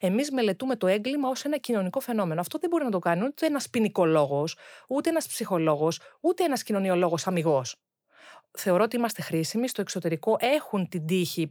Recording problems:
none

